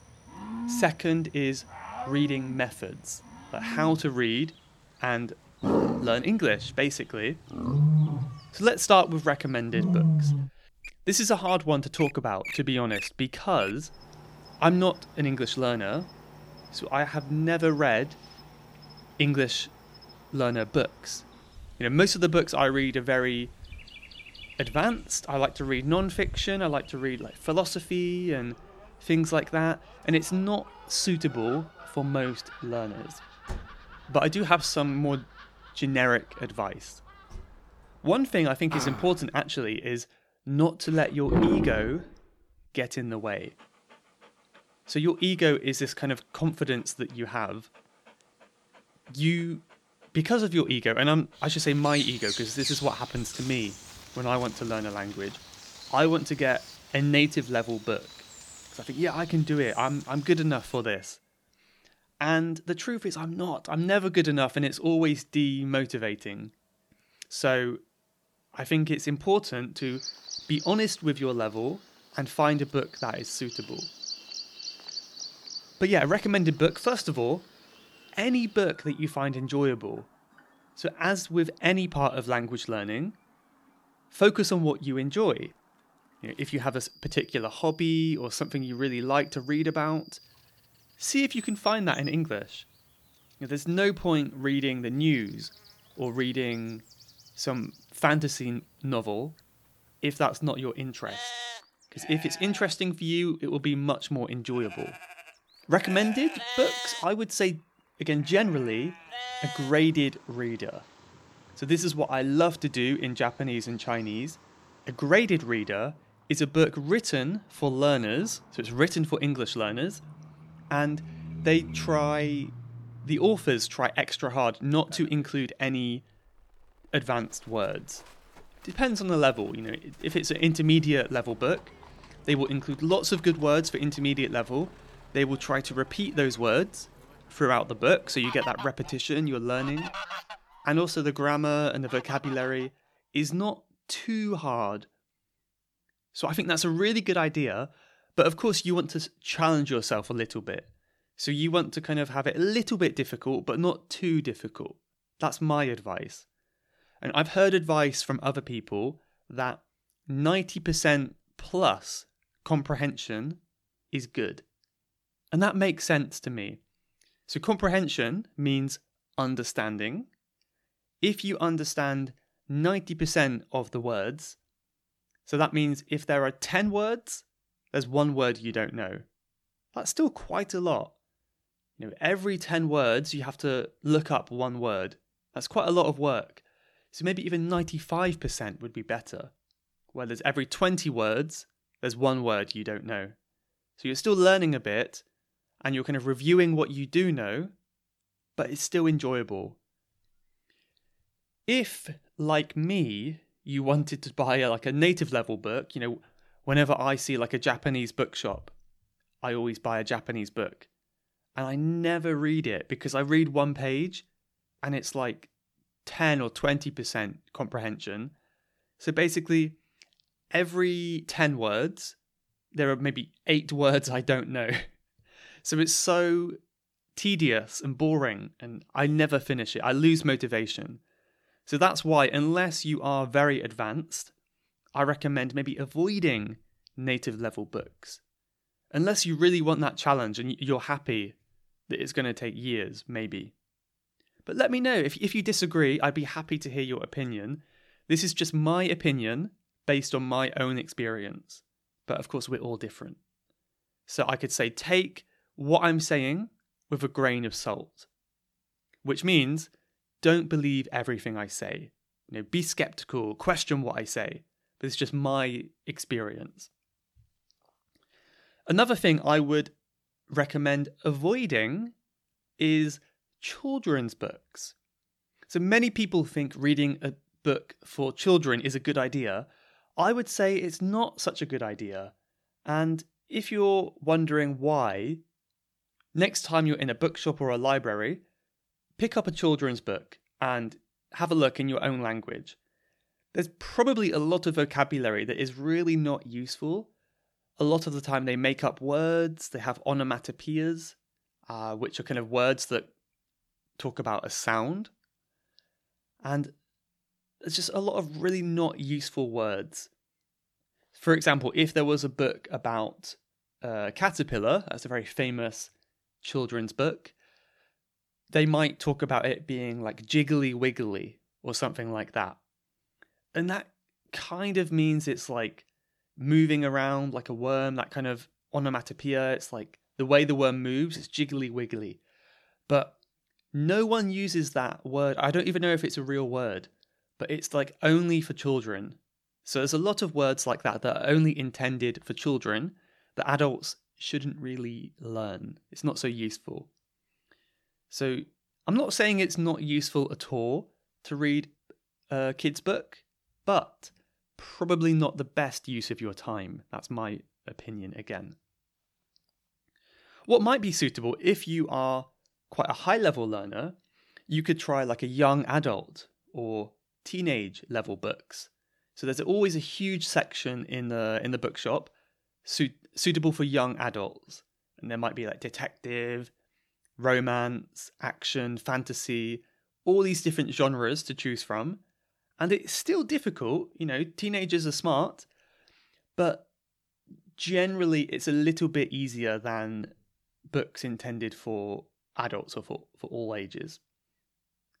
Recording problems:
animal sounds; loud; until 2:22; 8 dB below the speech

